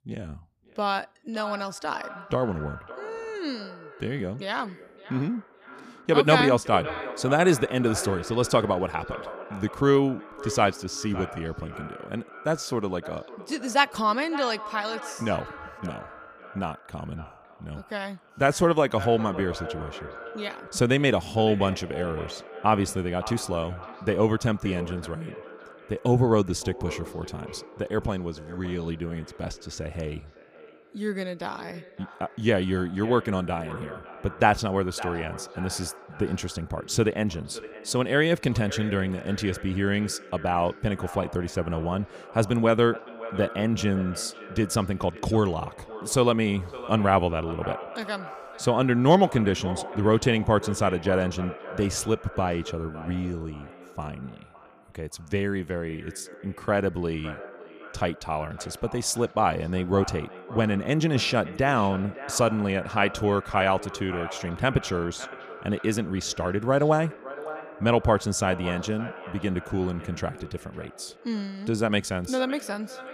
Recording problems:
echo of what is said; noticeable; throughout; 560 ms later, 15 dB below the speech

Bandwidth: 15 kHz